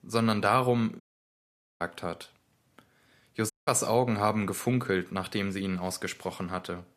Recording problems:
audio cutting out; at 1 s for 1 s and at 3.5 s

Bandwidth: 14.5 kHz